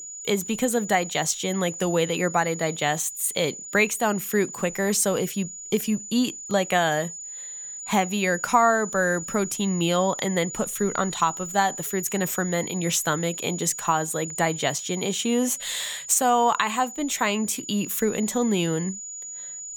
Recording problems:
high-pitched whine; loud; throughout; 7 kHz, 10 dB below the speech

